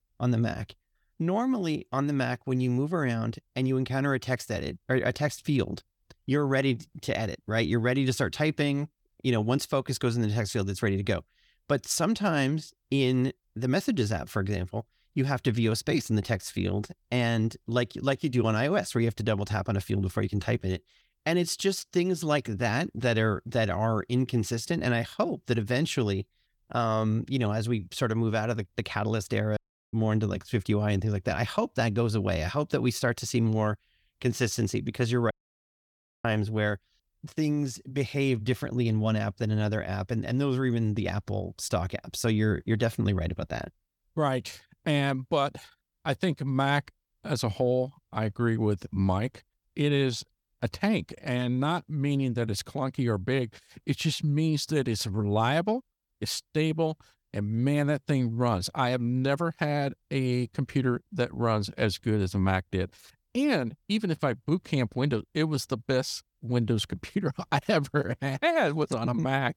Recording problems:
audio cutting out; at 30 s and at 35 s for 1 s

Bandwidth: 18 kHz